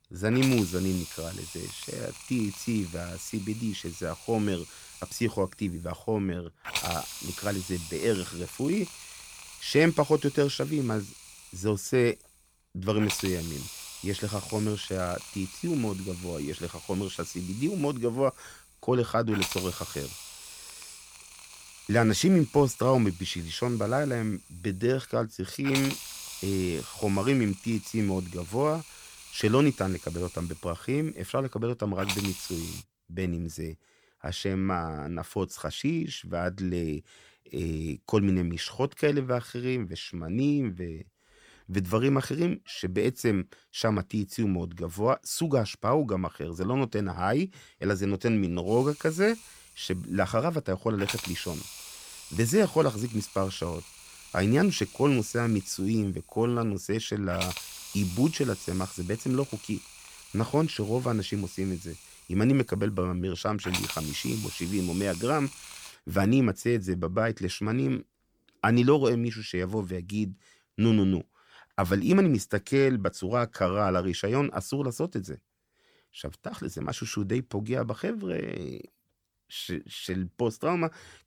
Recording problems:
hiss; noticeable; until 33 s and from 49 s to 1:06; 10 dB below the speech

